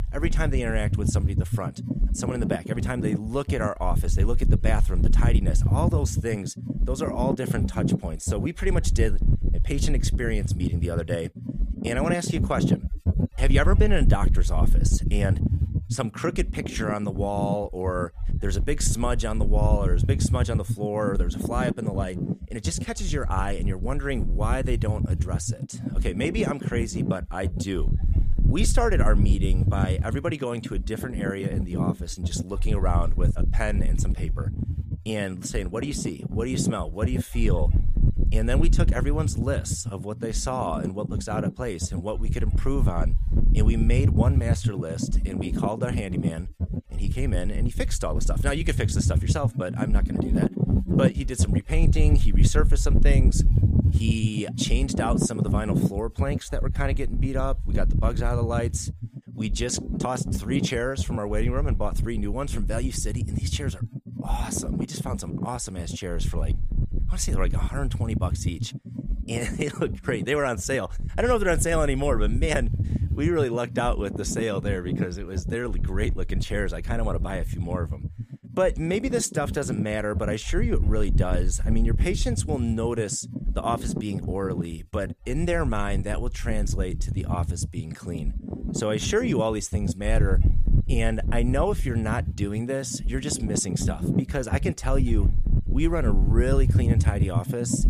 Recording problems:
wind noise on the microphone; heavy; 8 dB below the speech

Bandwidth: 14.5 kHz